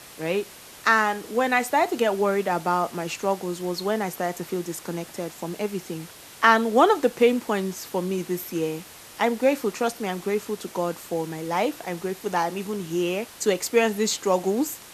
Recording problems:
hiss; noticeable; throughout; 20 dB below the speech

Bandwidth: 14 kHz